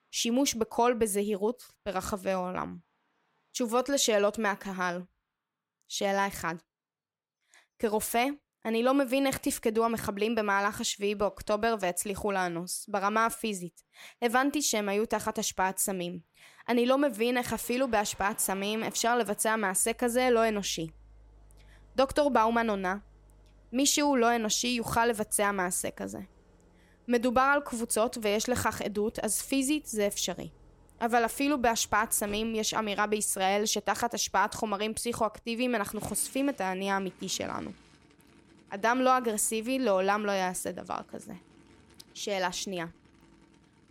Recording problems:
traffic noise; faint; throughout; 30 dB below the speech

